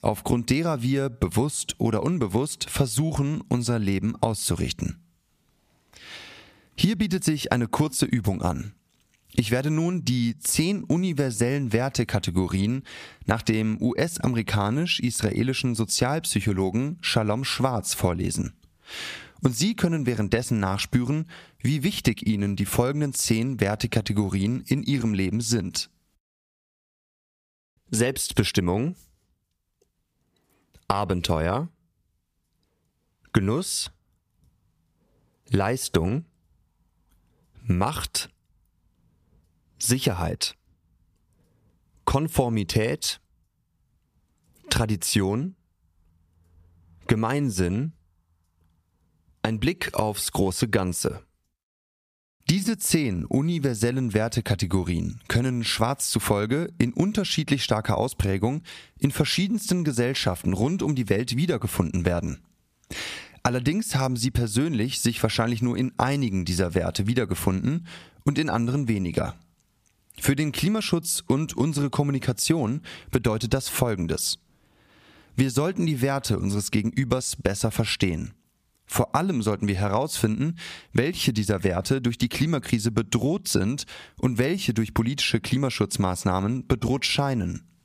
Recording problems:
squashed, flat; somewhat

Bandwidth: 15 kHz